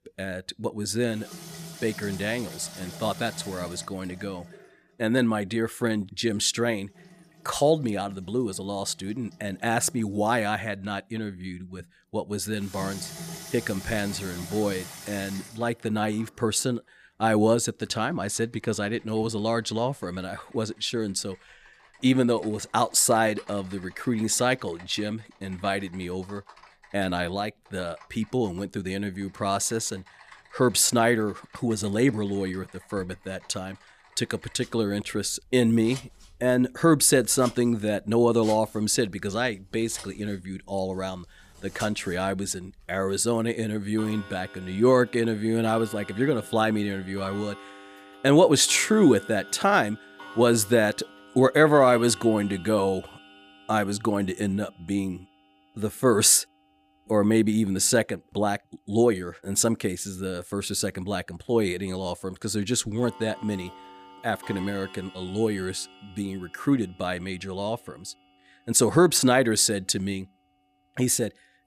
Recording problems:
household noises; noticeable; throughout; 20 dB below the speech

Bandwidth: 14.5 kHz